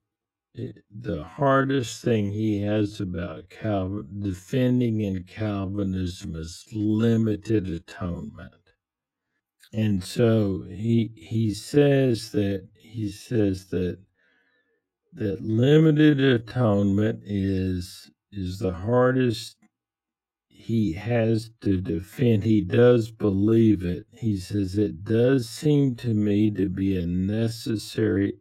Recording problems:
wrong speed, natural pitch; too slow; 0.5 times normal speed

